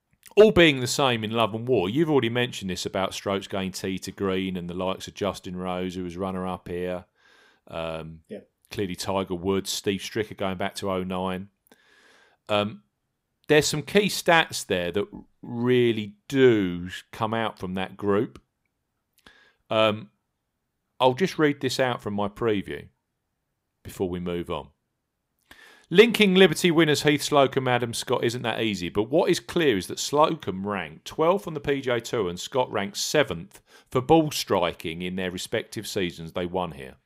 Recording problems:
none

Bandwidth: 15.5 kHz